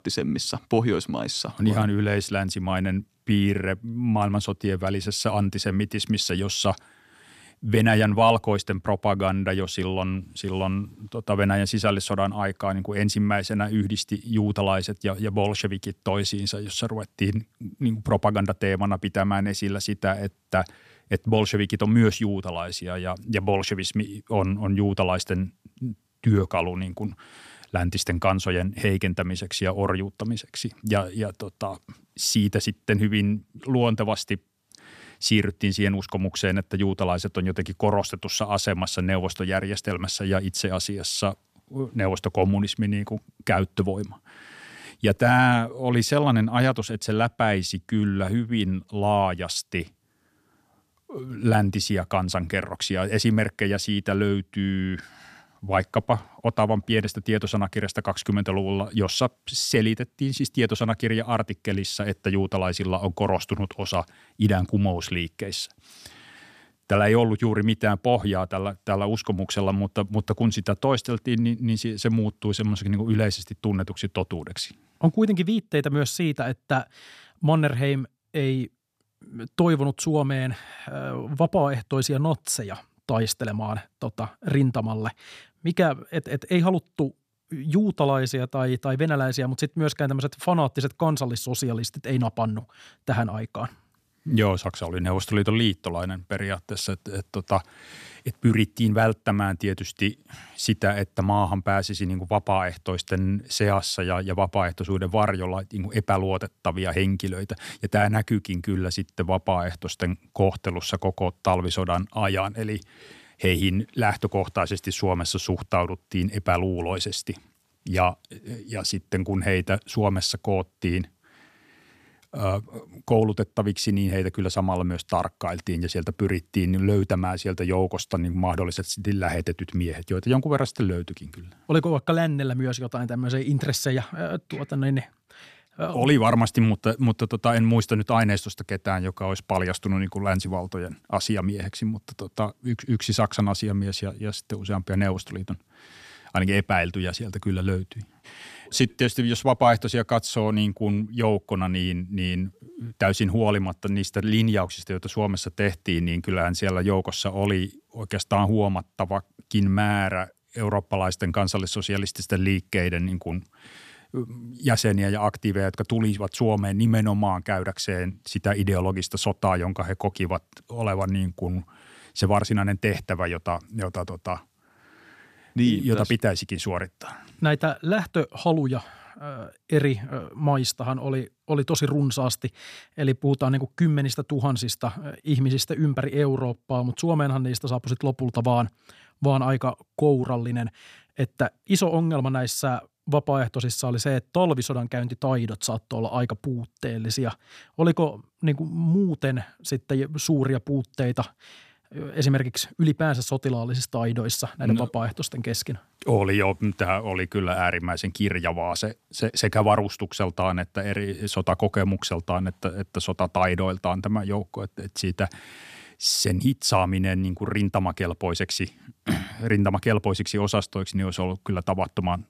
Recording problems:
none

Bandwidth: 14.5 kHz